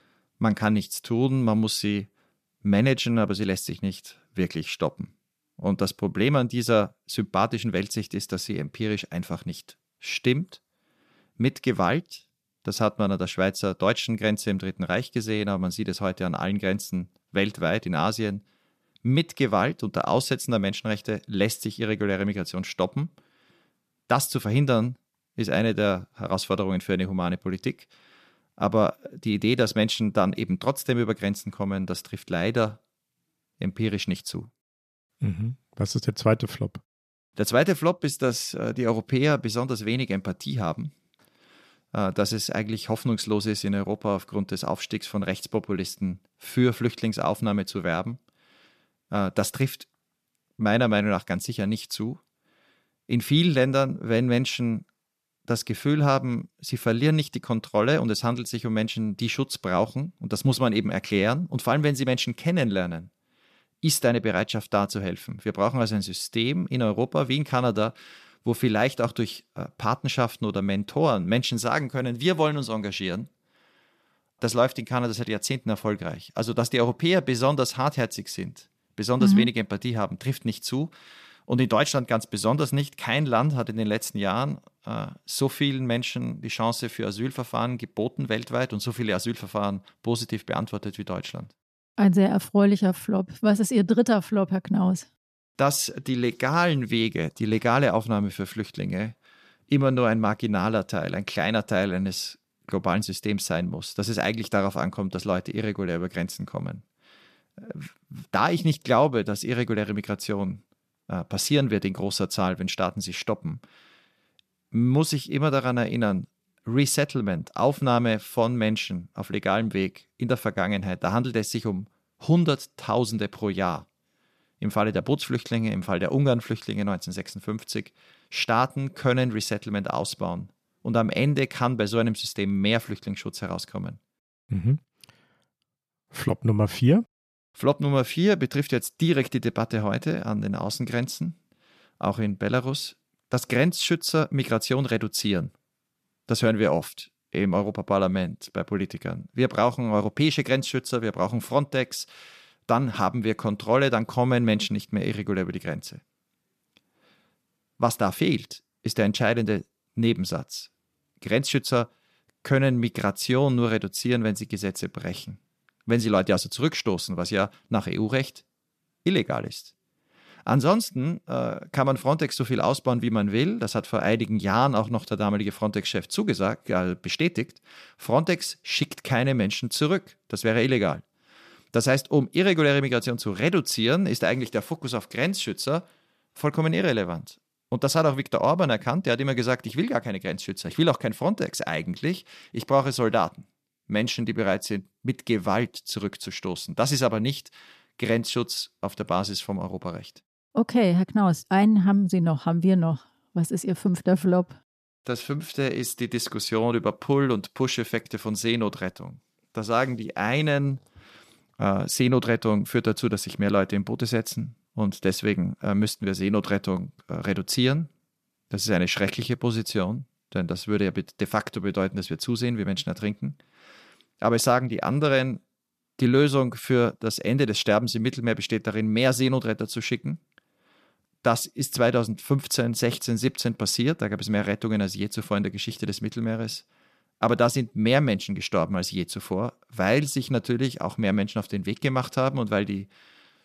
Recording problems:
none

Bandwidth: 14.5 kHz